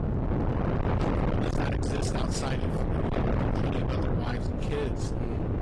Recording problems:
distortion; heavy; 6 dB below the speech
garbled, watery; slightly
wind noise on the microphone; heavy; 1 dB above the speech
animal sounds; very faint; until 1 s, mostly in the pauses; 20 dB below the speech

